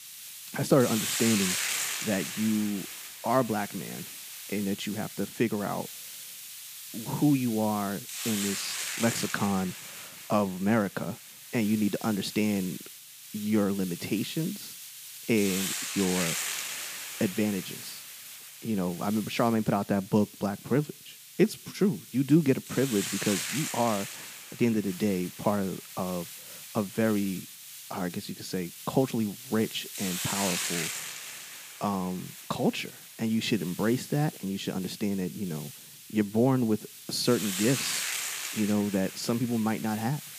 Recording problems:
hiss; loud; throughout; 6 dB below the speech

